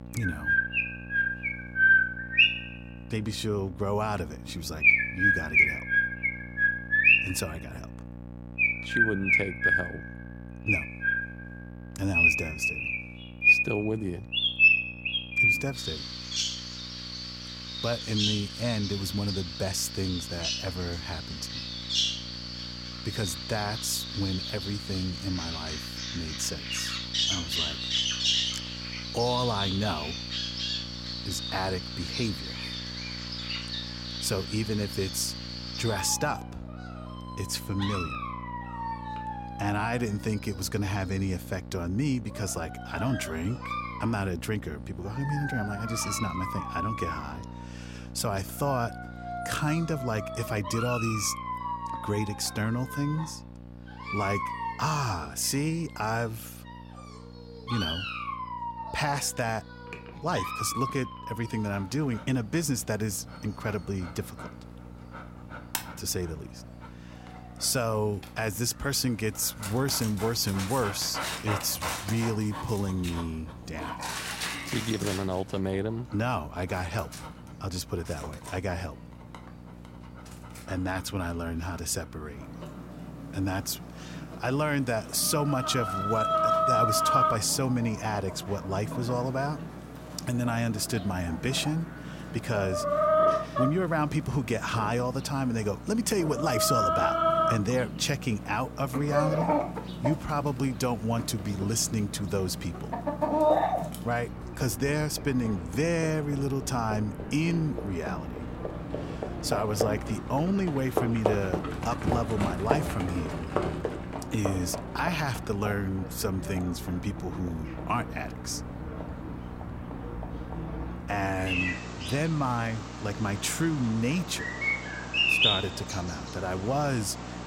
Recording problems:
animal sounds; very loud; throughout; 2 dB above the speech
electrical hum; noticeable; throughout; 60 Hz, 20 dB below the speech

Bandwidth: 16 kHz